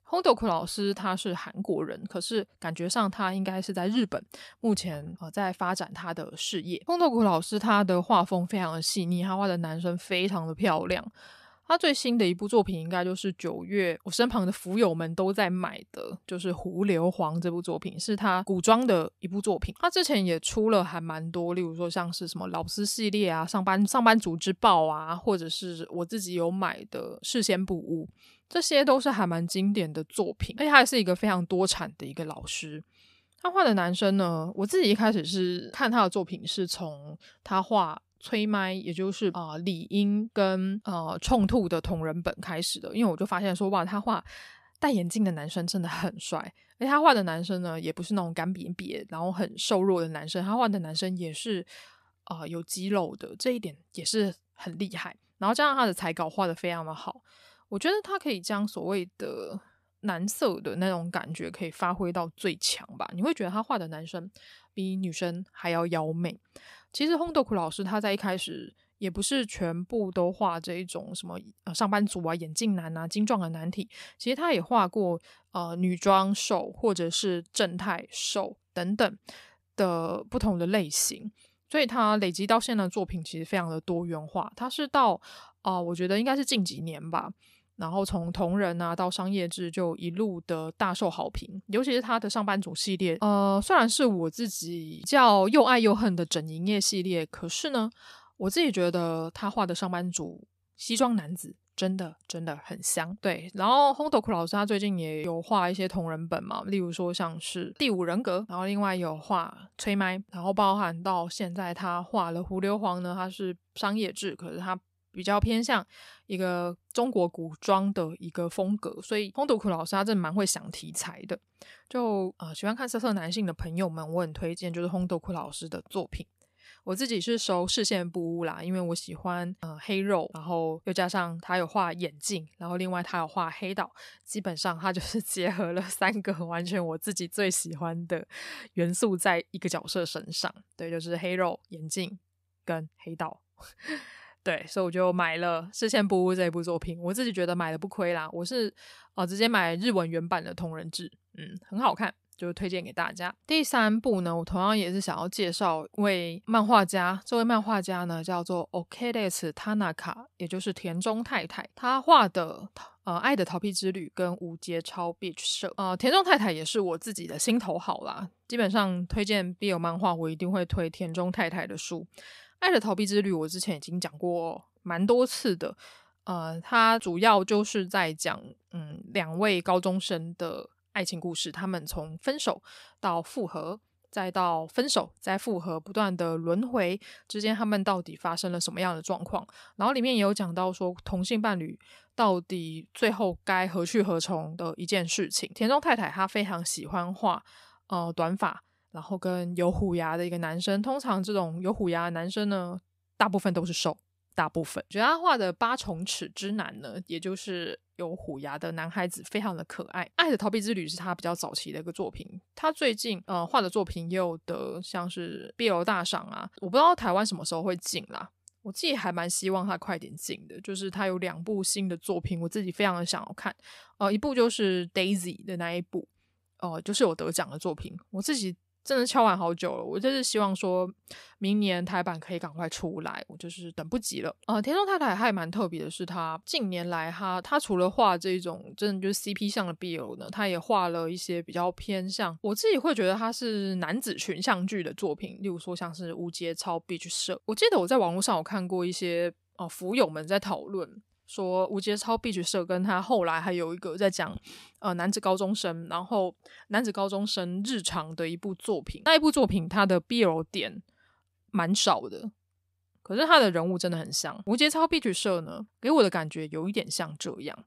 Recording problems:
none

